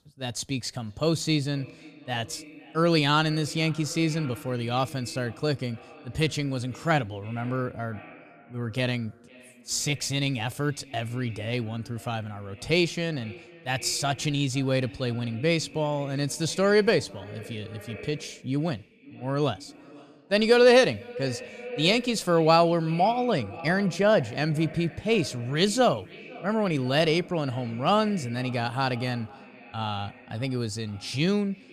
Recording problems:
echo of what is said; faint; throughout; 500 ms later, 20 dB below the speech

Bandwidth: 15 kHz